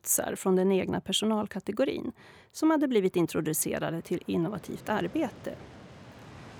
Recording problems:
train or aircraft noise; faint; throughout; 20 dB below the speech

